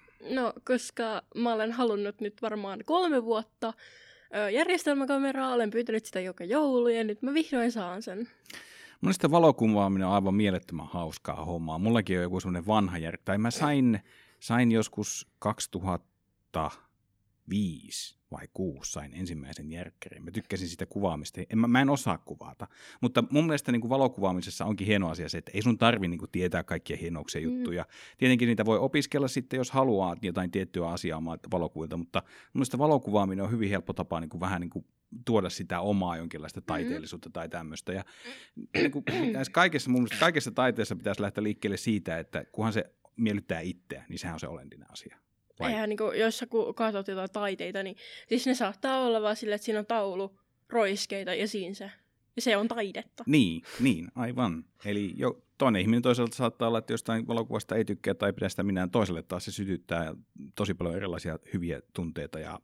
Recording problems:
none

